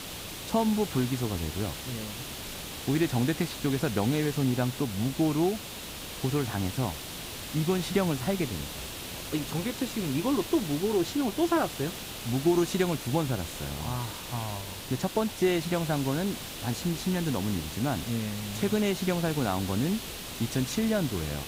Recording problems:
hiss; loud; throughout; 7 dB below the speech

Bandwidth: 15.5 kHz